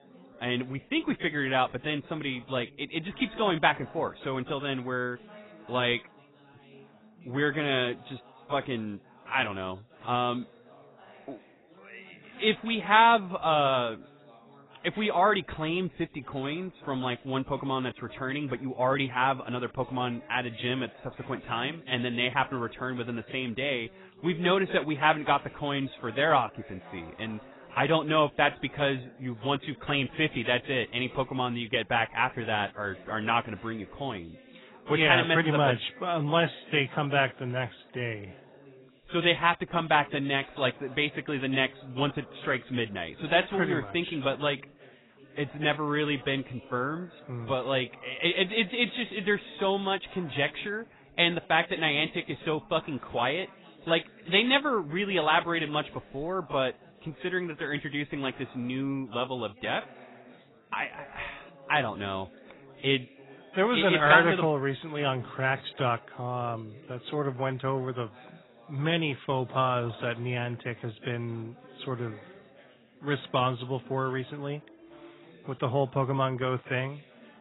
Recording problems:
garbled, watery; badly; nothing above 4 kHz
background chatter; faint; throughout; 4 voices, 25 dB below the speech

